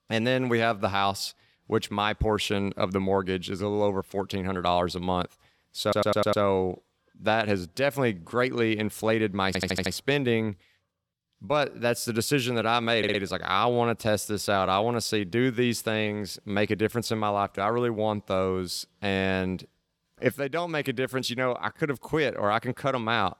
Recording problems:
audio stuttering; at 6 s, at 9.5 s and at 13 s

